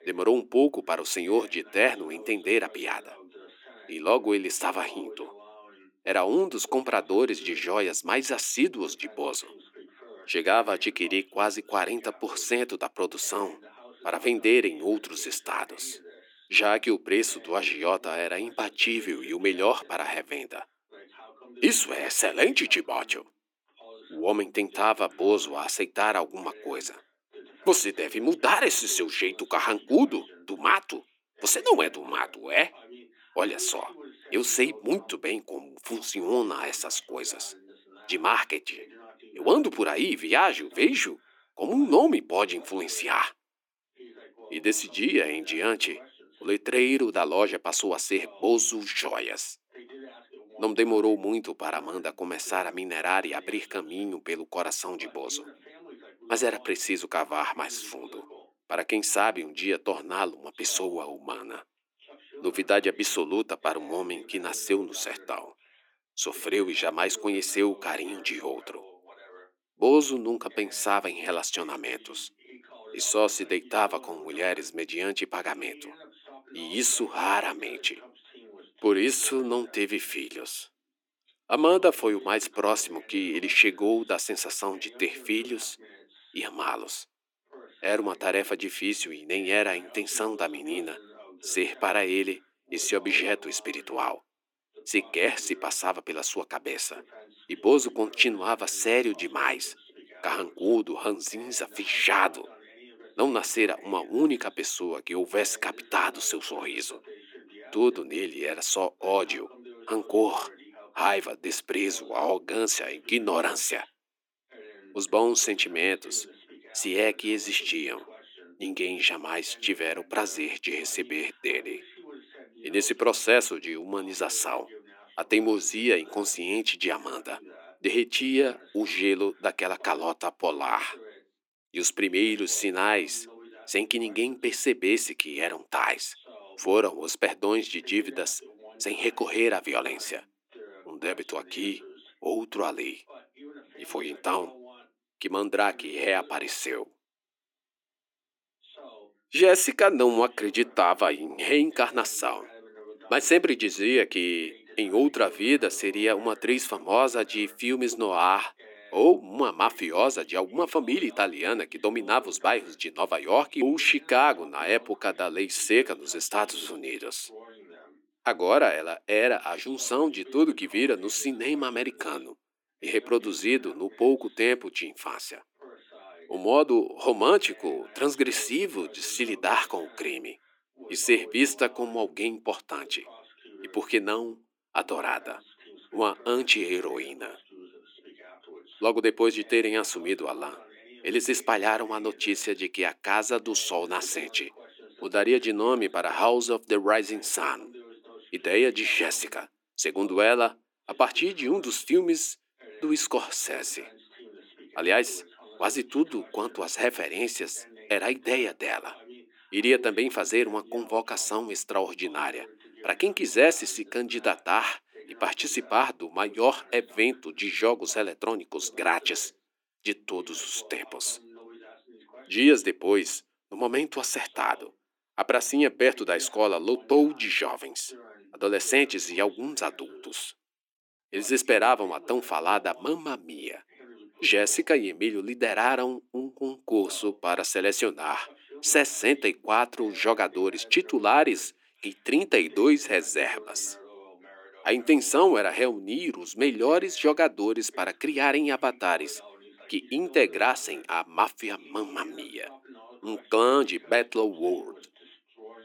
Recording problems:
thin; somewhat; fading below 300 Hz
voice in the background; faint; throughout; 25 dB below the speech

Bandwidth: 19 kHz